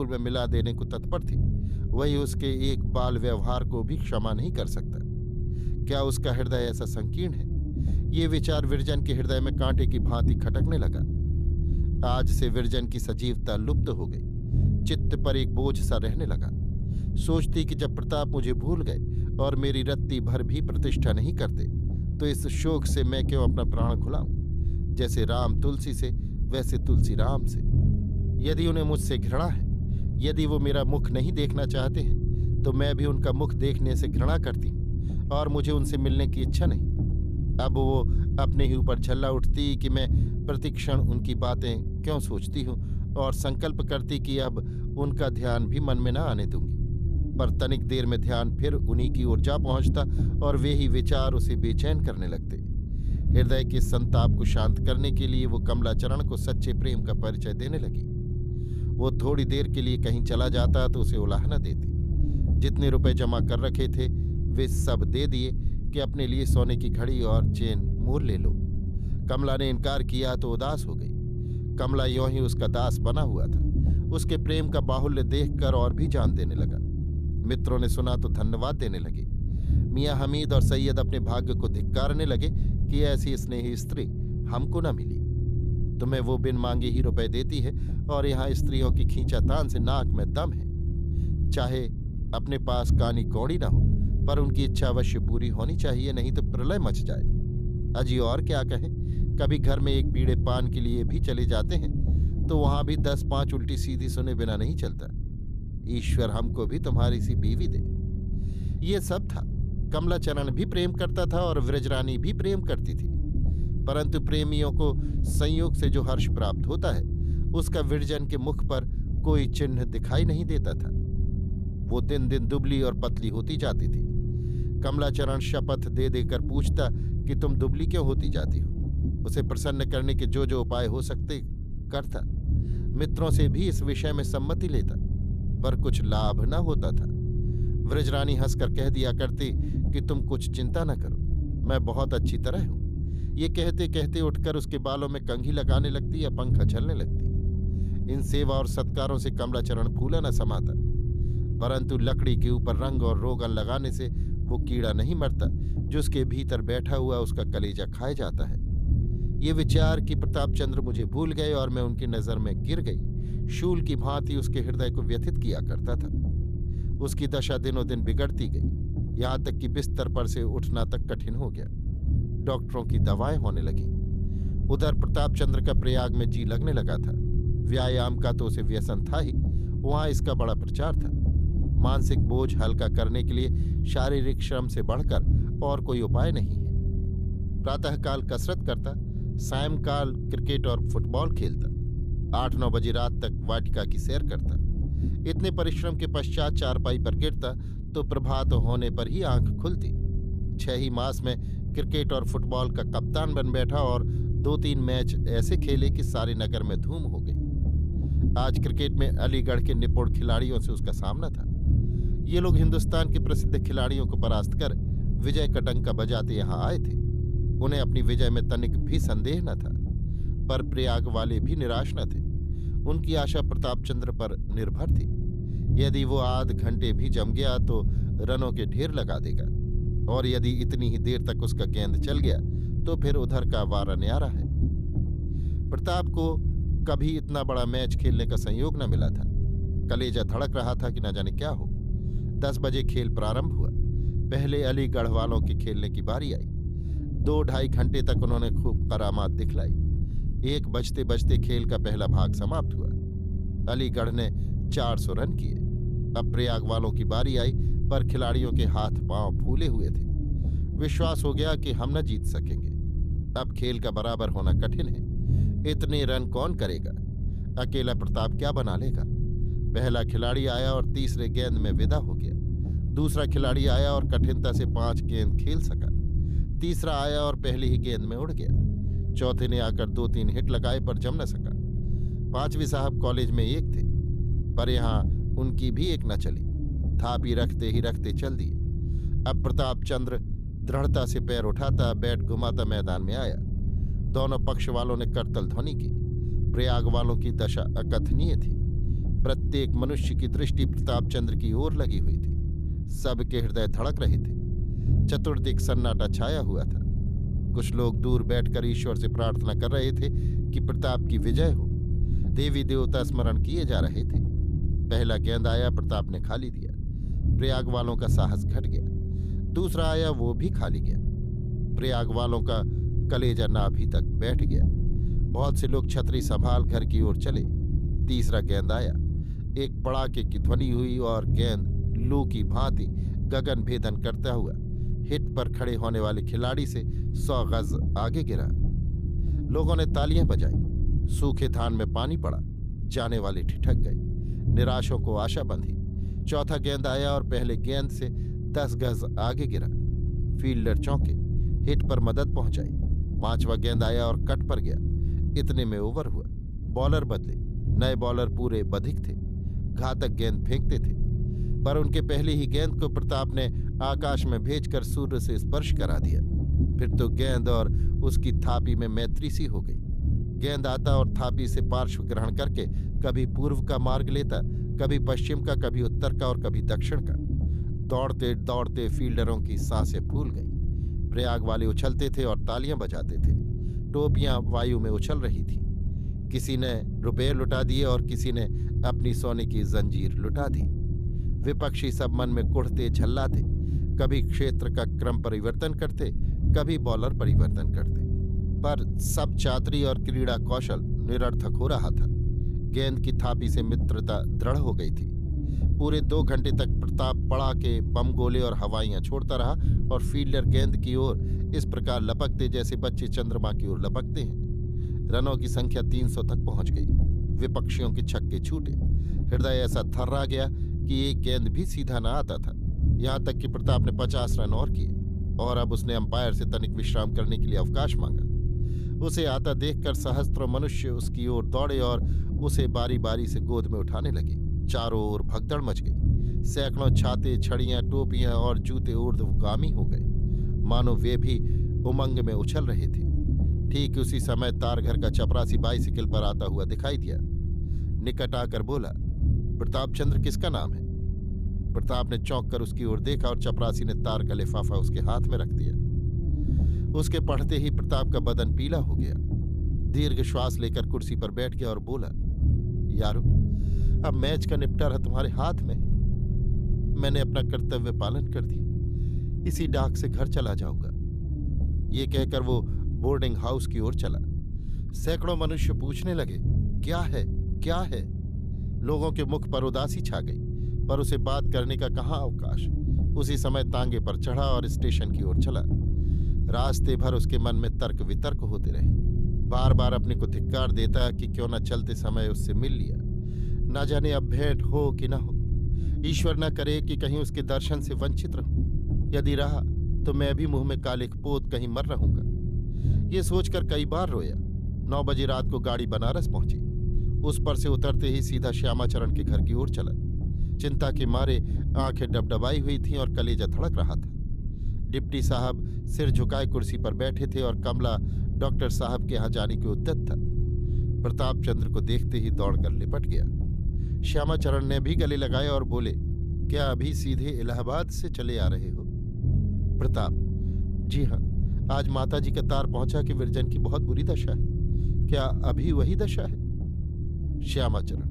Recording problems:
low rumble; loud; throughout; 9 dB below the speech
abrupt cut into speech; at the start

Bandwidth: 14.5 kHz